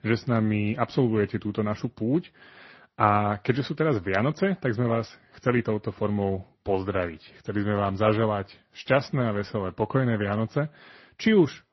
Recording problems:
garbled, watery; slightly; nothing above 6 kHz

